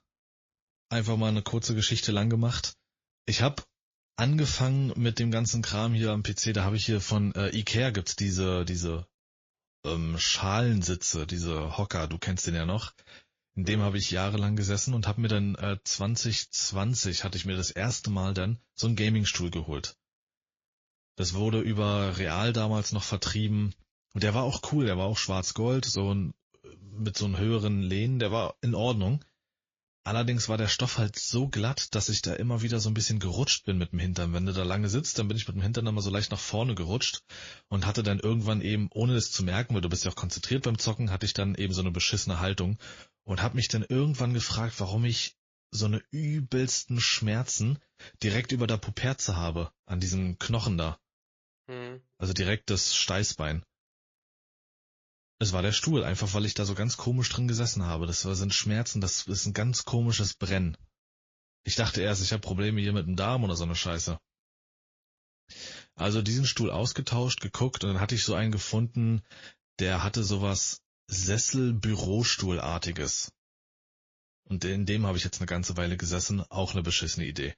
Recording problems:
garbled, watery; slightly; nothing above 6 kHz

